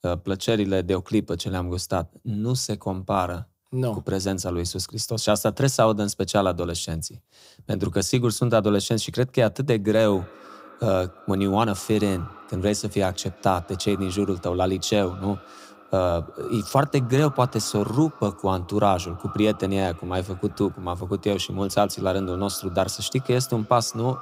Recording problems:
echo of what is said; faint; from 10 s on; 190 ms later, 20 dB below the speech

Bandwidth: 15.5 kHz